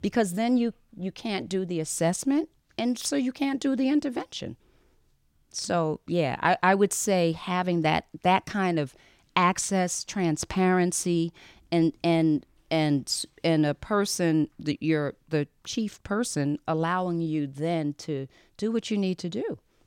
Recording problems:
none

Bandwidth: 16.5 kHz